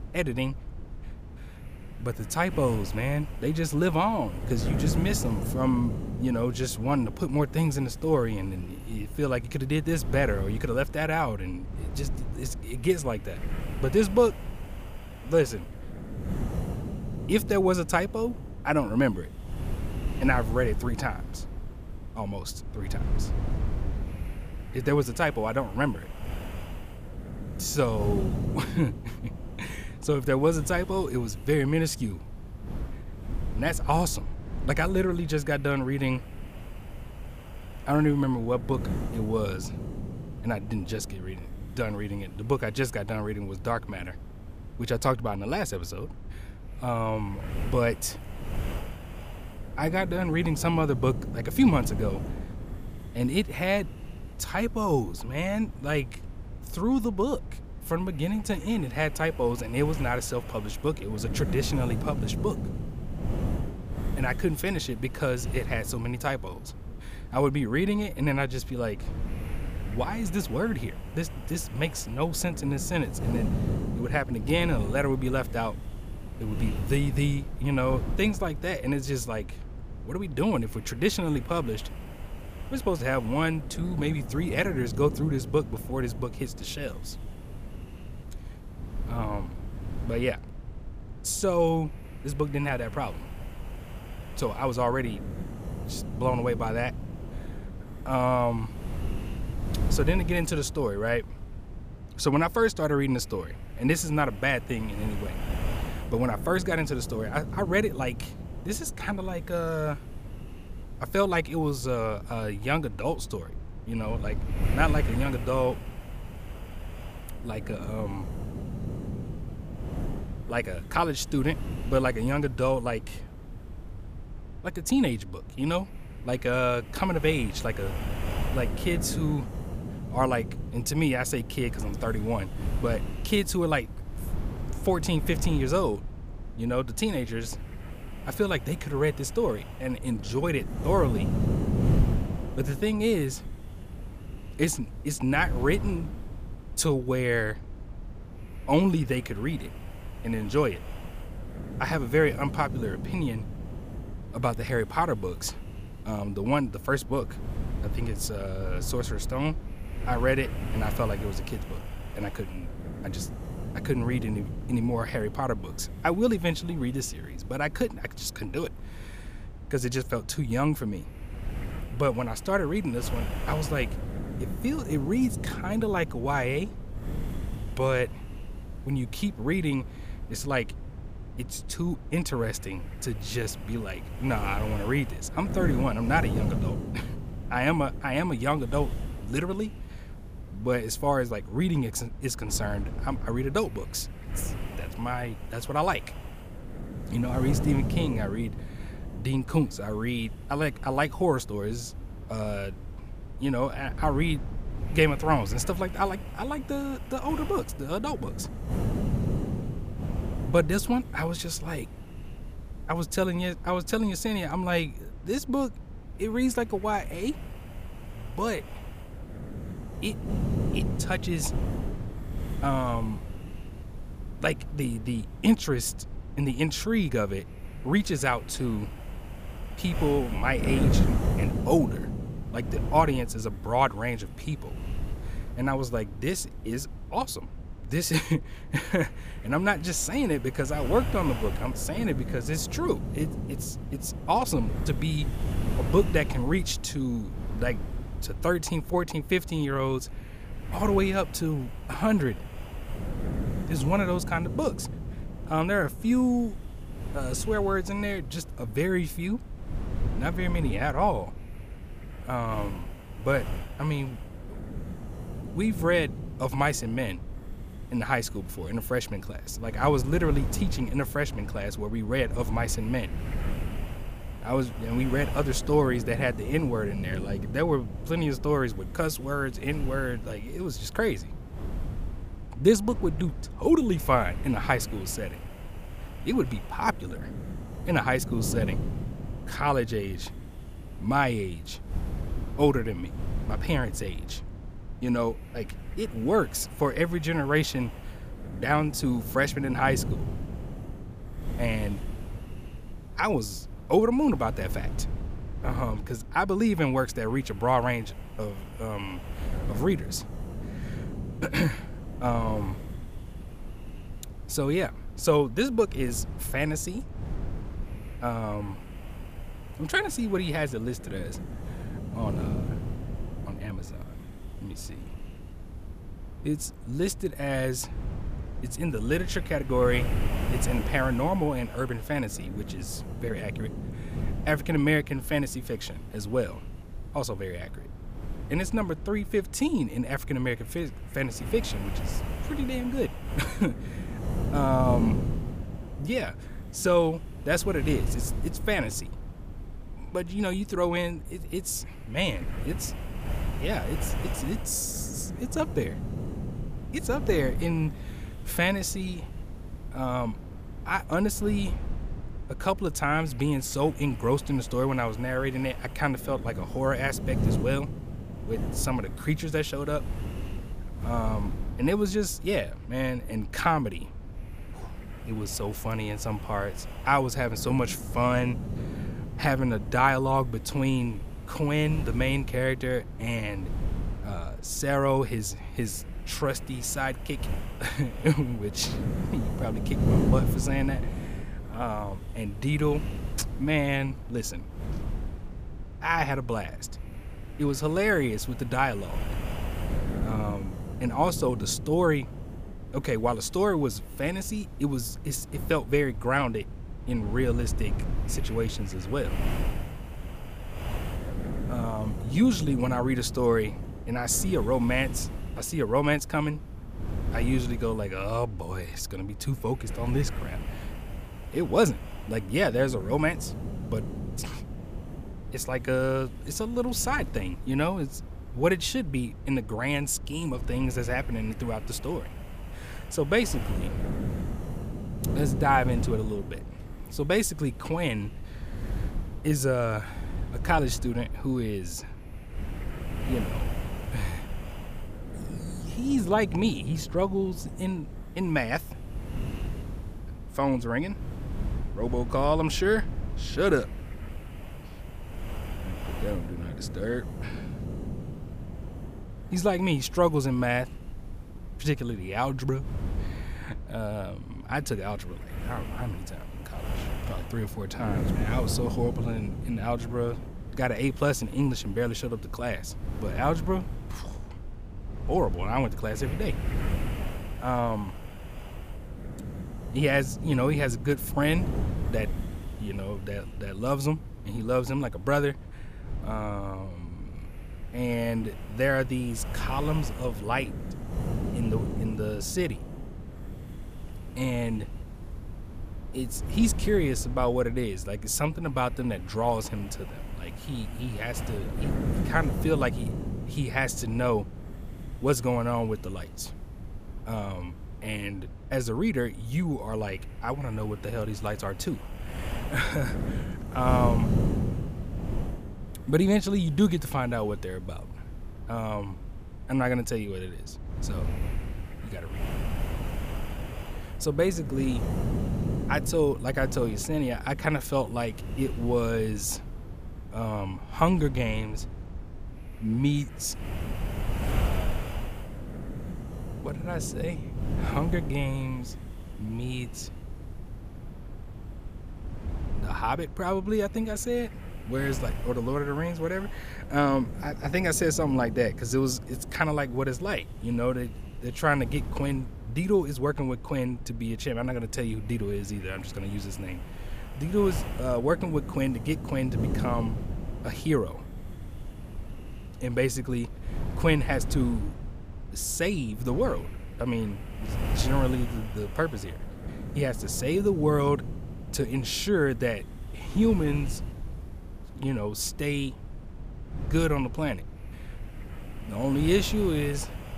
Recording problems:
wind noise on the microphone; occasional gusts; 15 dB below the speech

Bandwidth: 15 kHz